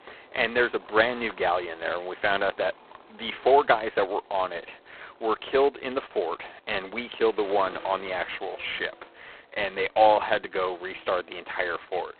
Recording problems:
phone-call audio; poor line; nothing above 4 kHz
traffic noise; faint; throughout; 25 dB below the speech

